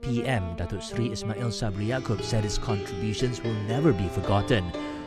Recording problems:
background music; loud; throughout; 7 dB below the speech

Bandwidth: 14.5 kHz